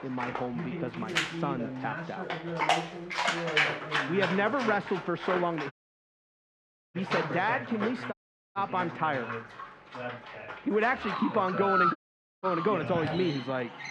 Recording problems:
muffled; very; fading above 2 kHz
animal sounds; loud; throughout; 2 dB below the speech
voice in the background; loud; throughout; 8 dB below the speech
audio cutting out; at 5.5 s for 1 s, at 8 s and at 12 s

